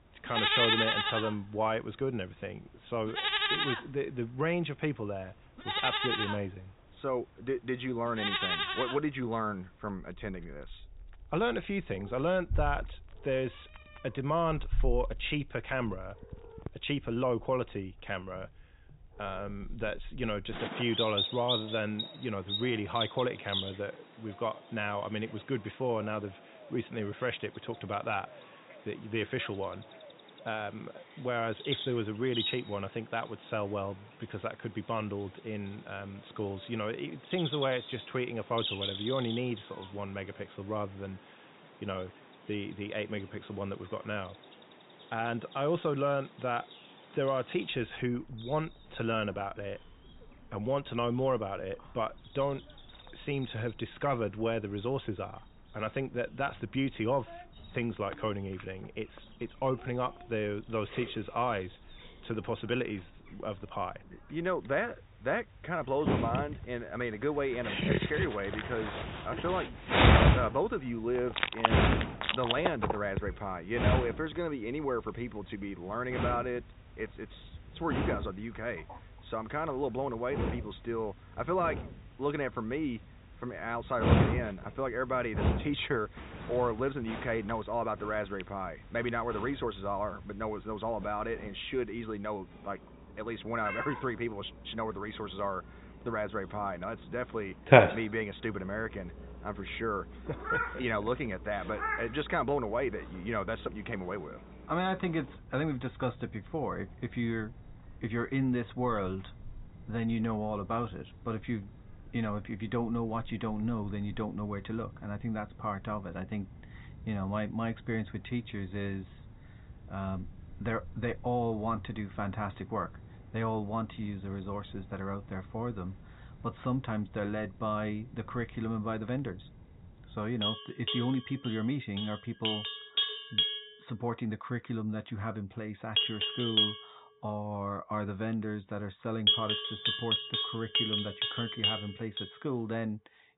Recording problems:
high frequencies cut off; severe; nothing above 4 kHz
animal sounds; very loud; throughout; 3 dB above the speech

